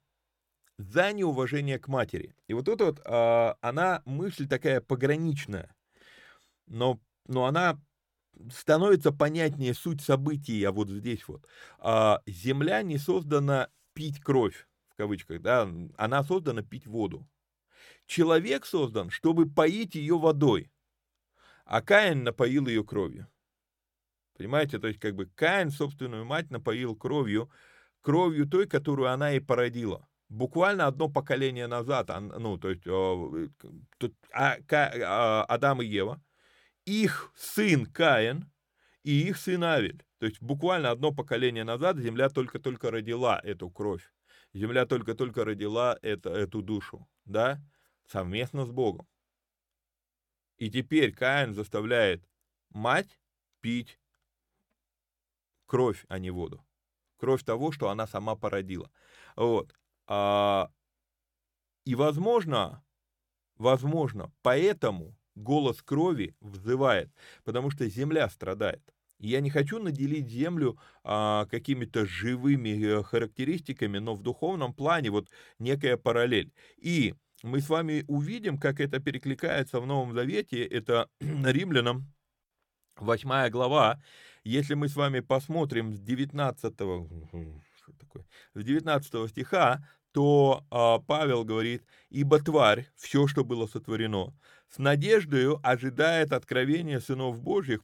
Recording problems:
none

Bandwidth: 17 kHz